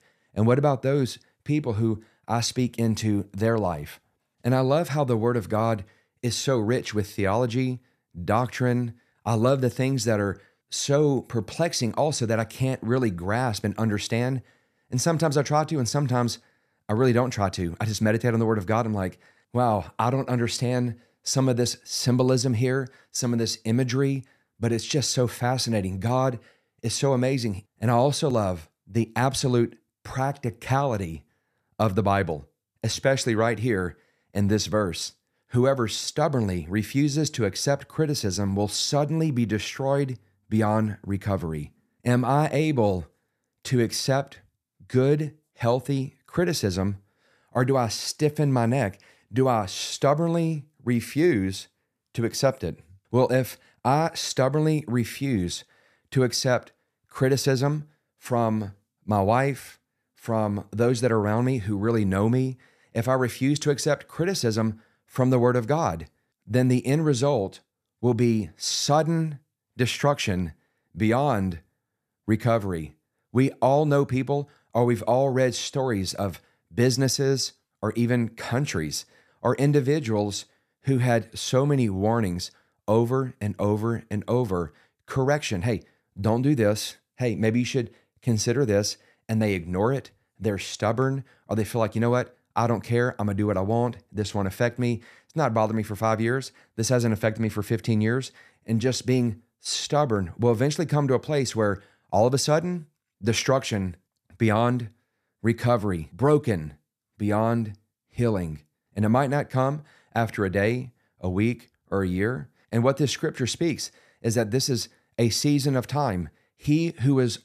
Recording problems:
none

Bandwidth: 14.5 kHz